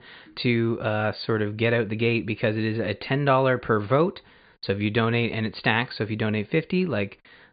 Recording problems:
high frequencies cut off; severe; nothing above 4.5 kHz

